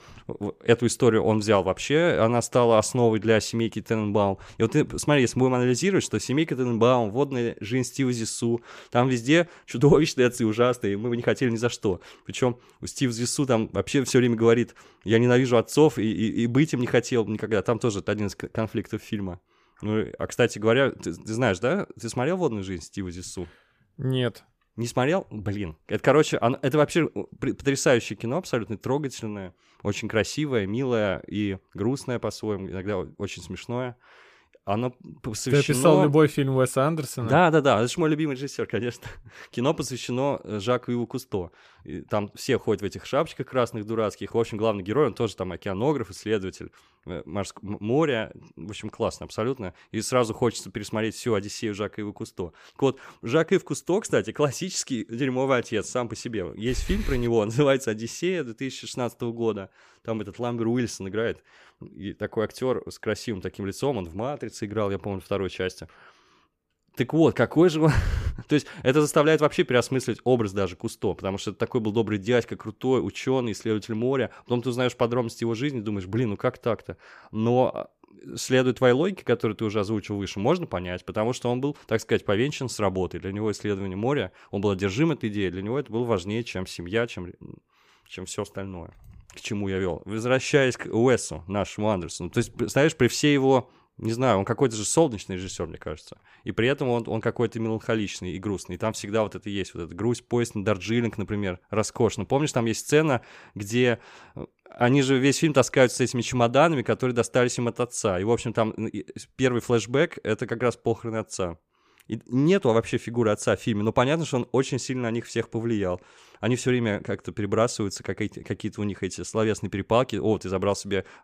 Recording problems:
none

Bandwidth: 15 kHz